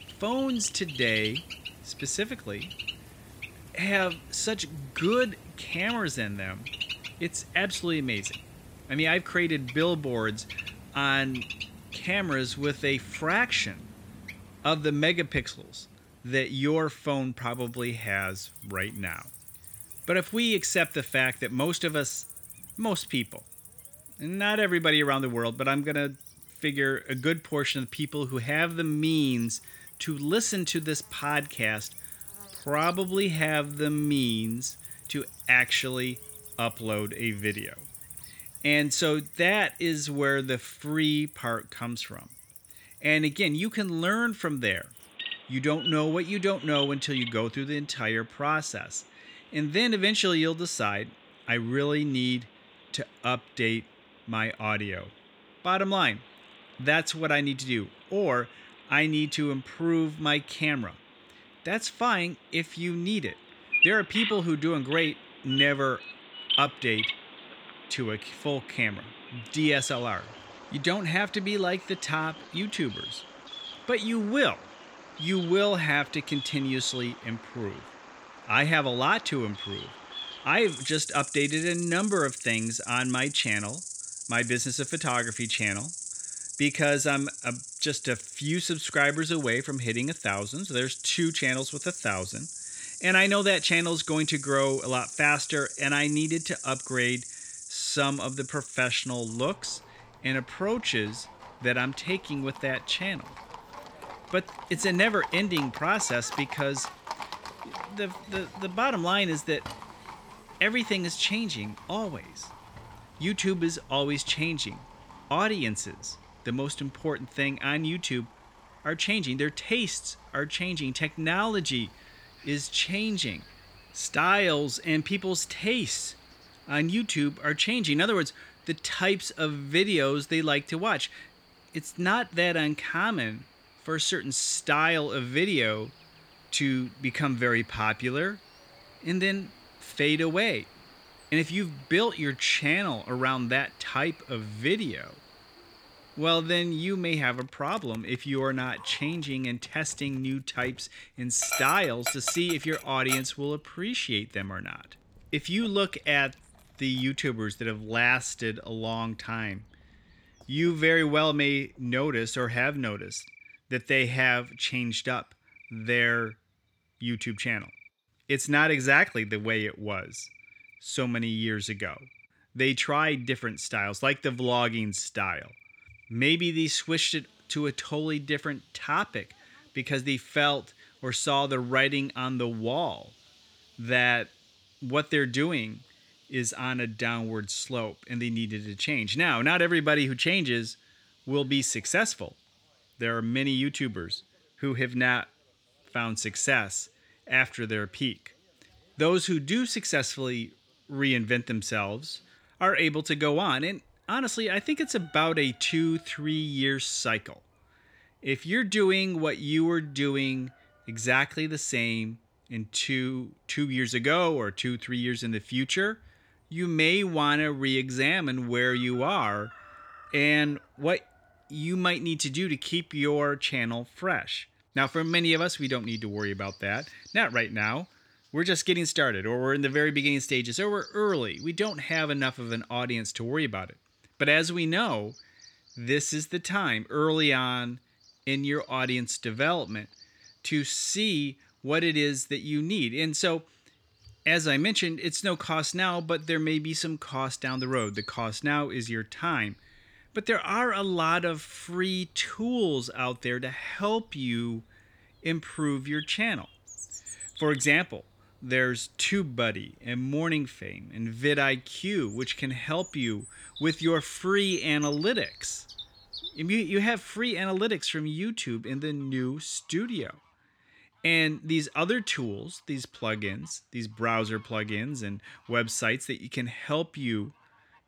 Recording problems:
animal sounds; noticeable; throughout; 10 dB below the speech

